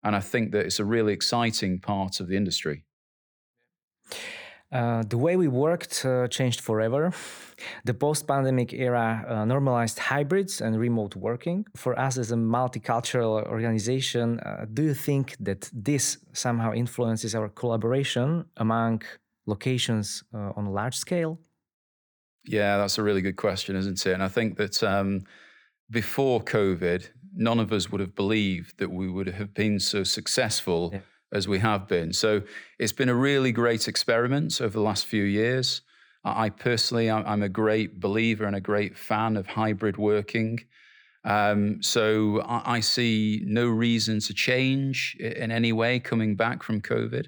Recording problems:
none

